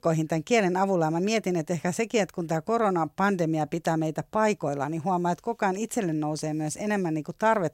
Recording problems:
none

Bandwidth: 16 kHz